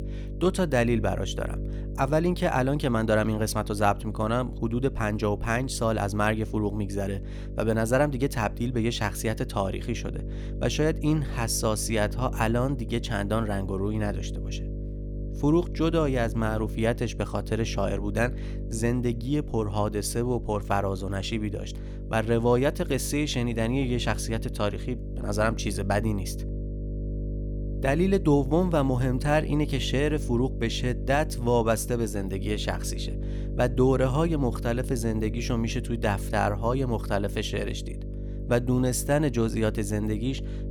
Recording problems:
electrical hum; noticeable; throughout; 50 Hz, 15 dB below the speech

